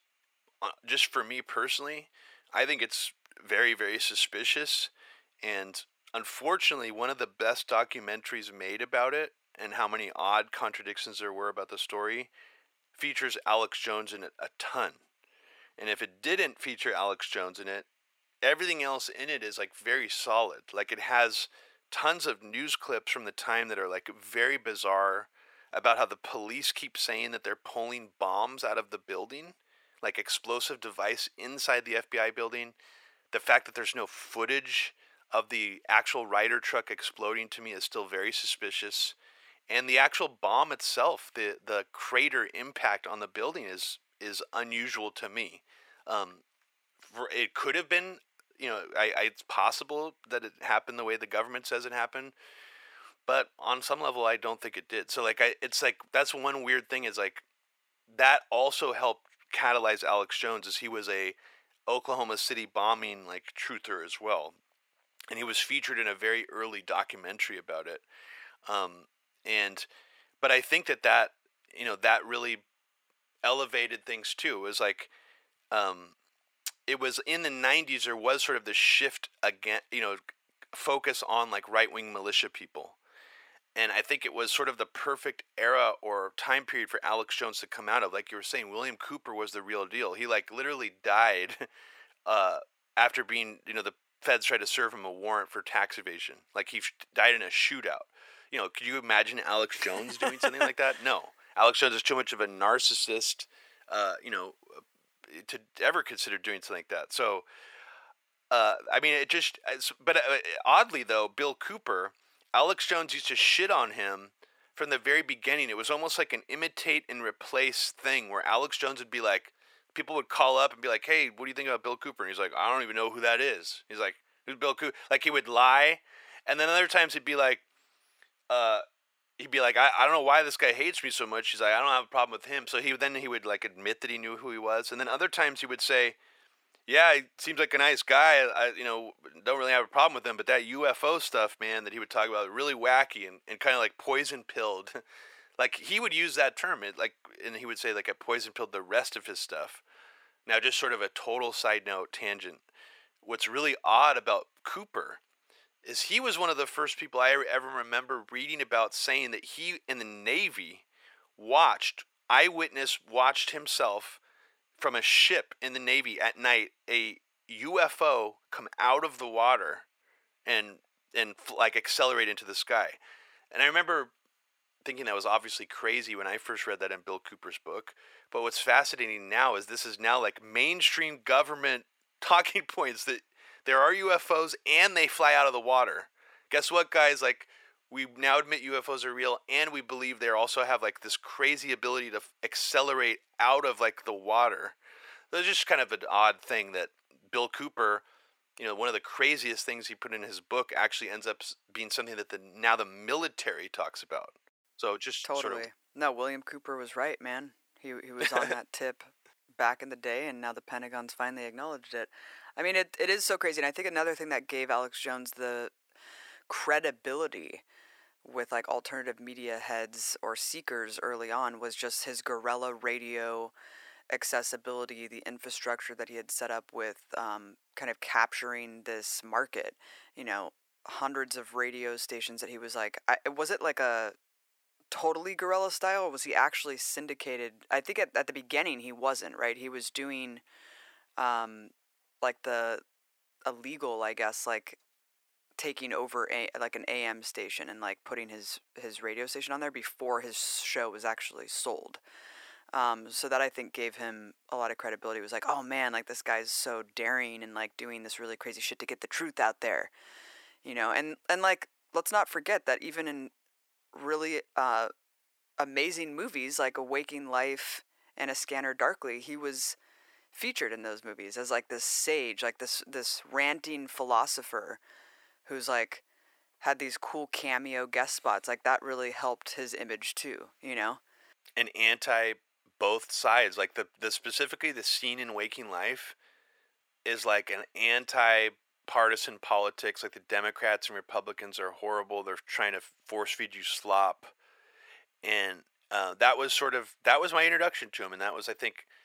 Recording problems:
thin; very; fading below 650 Hz

